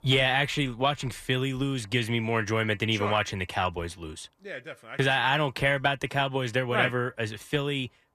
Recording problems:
none

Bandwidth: 14.5 kHz